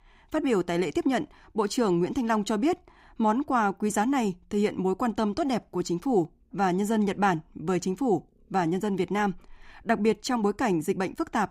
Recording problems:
none

